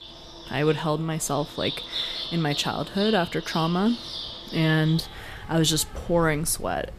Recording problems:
animal sounds; loud; throughout; 9 dB below the speech

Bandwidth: 14.5 kHz